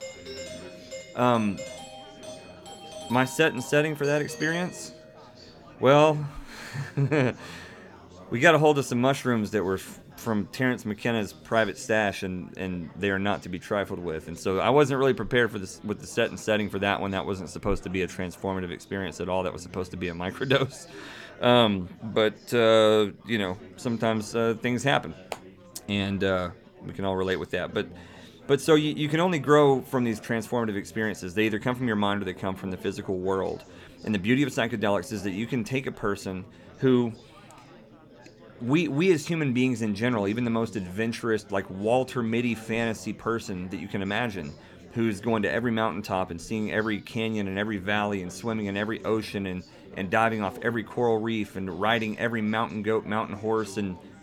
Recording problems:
chatter from many people; faint; throughout; 20 dB below the speech
doorbell; faint; until 5 s; peak 10 dB below the speech

